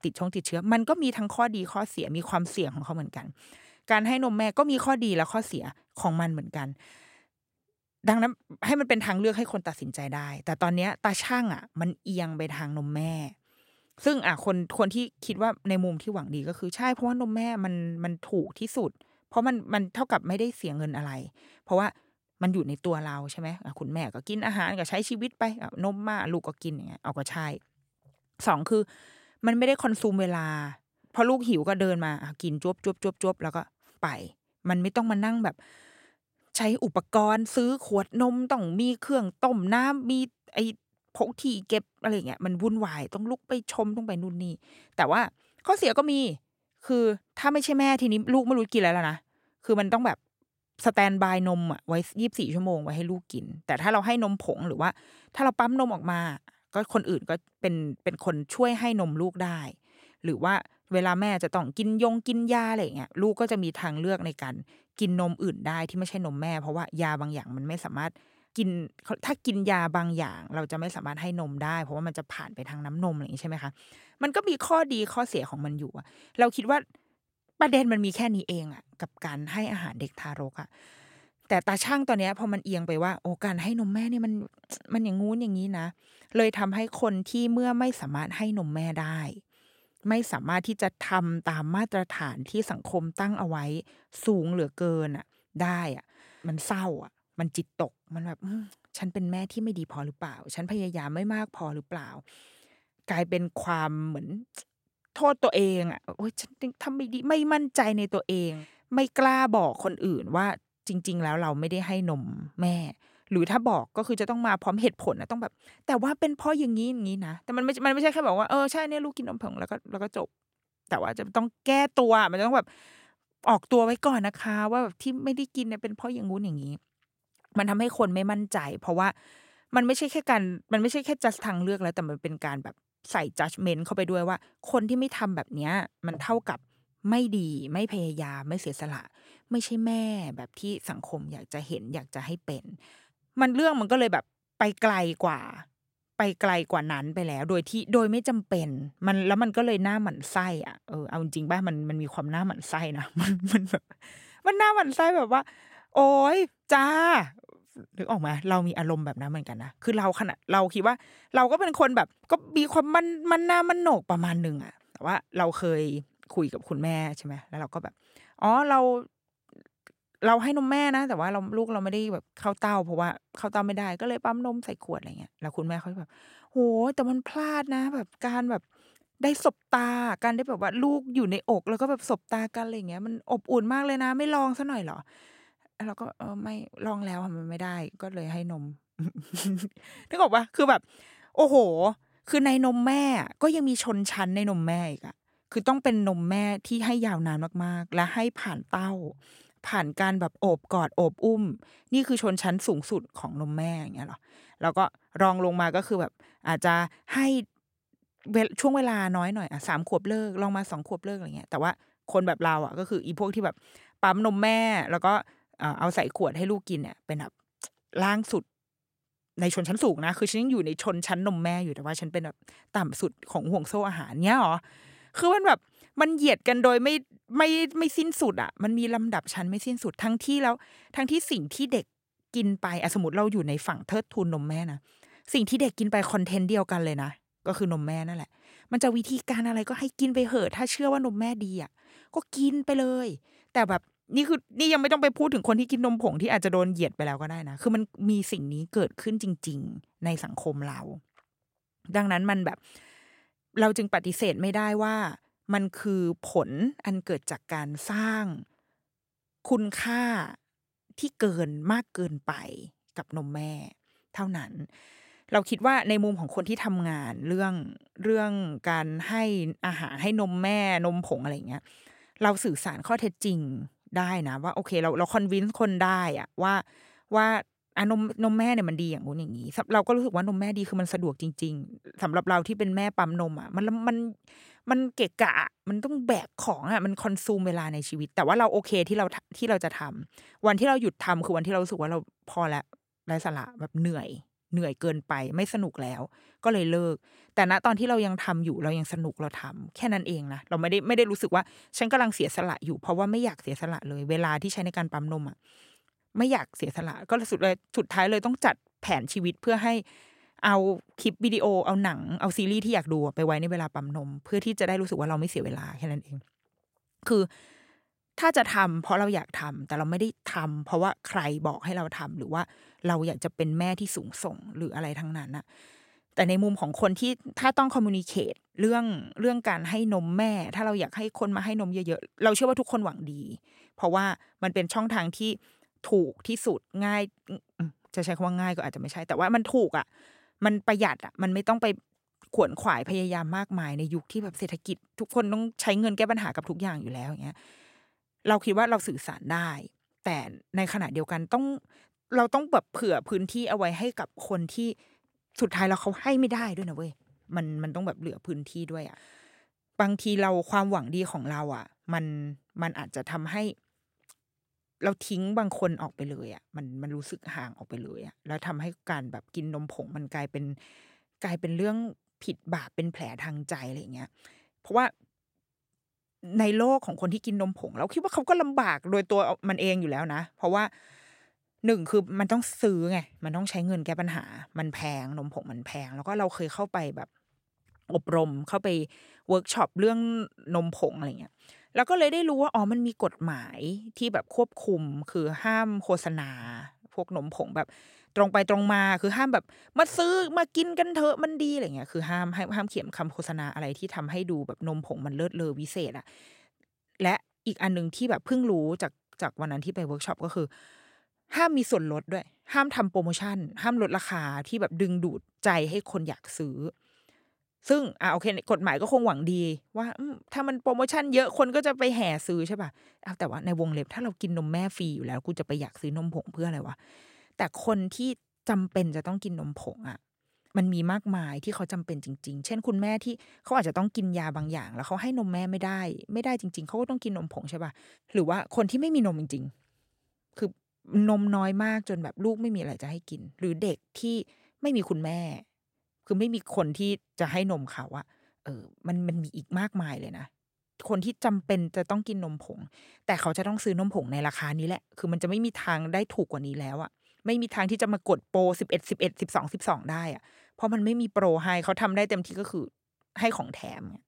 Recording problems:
none

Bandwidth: 16 kHz